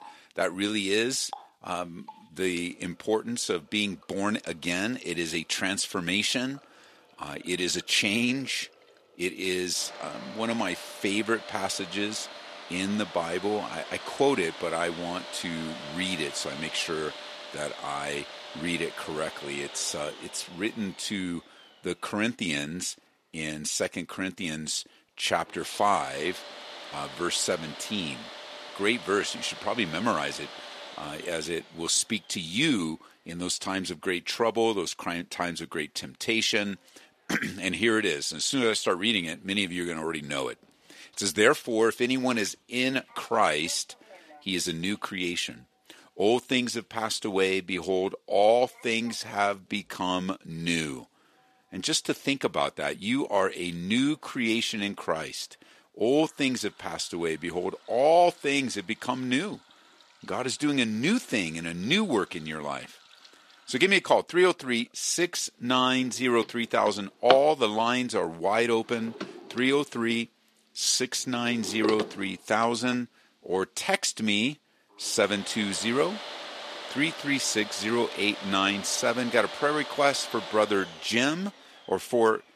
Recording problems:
thin; somewhat; fading below 300 Hz
household noises; noticeable; throughout; 10 dB below the speech

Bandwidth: 13.5 kHz